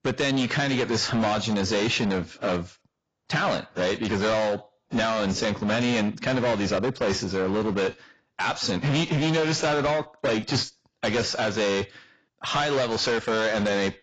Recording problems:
distortion; heavy; 22% of the sound clipped
garbled, watery; badly; nothing above 7.5 kHz

